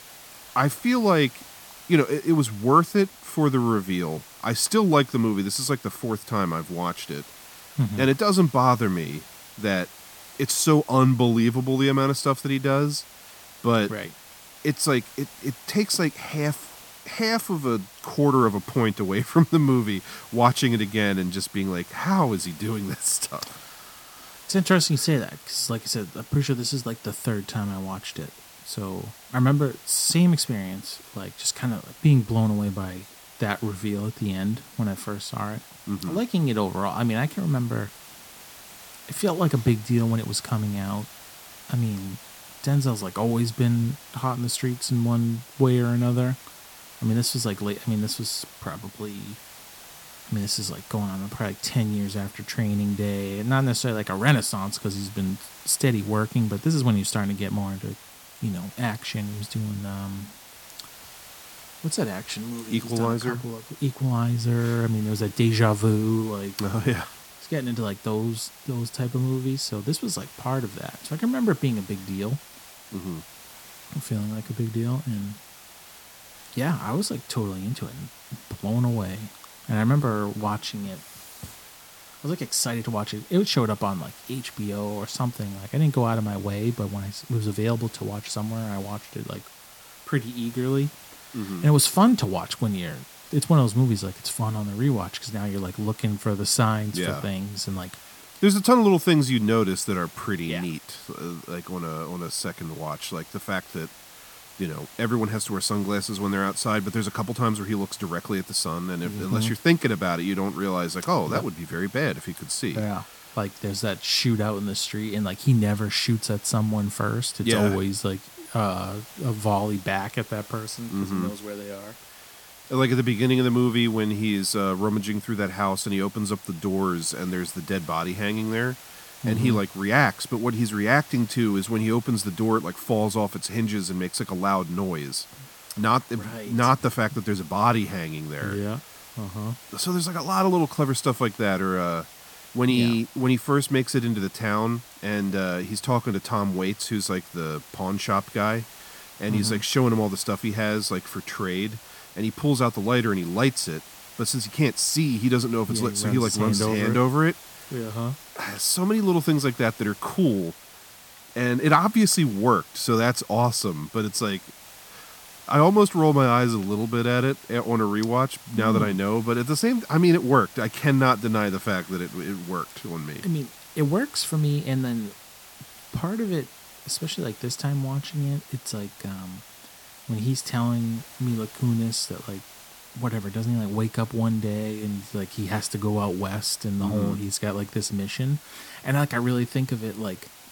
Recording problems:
hiss; noticeable; throughout; 20 dB below the speech

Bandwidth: 17.5 kHz